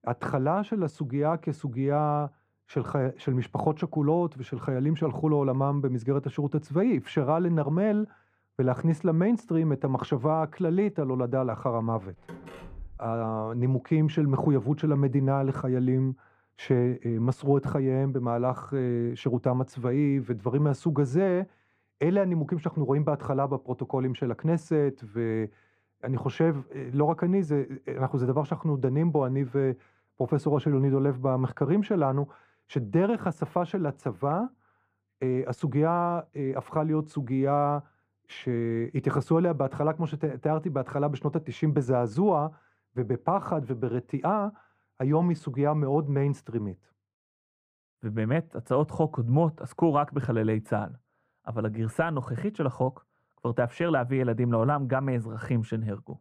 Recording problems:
muffled; very; fading above 2.5 kHz
door banging; faint; at 12 s; peak 15 dB below the speech

